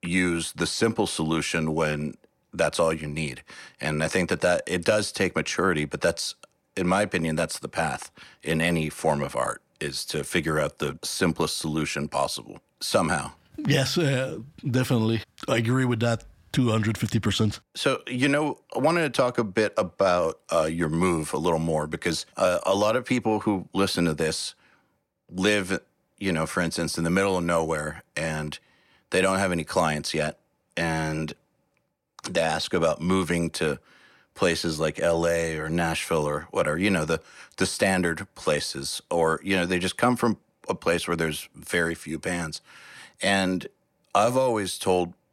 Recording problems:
none

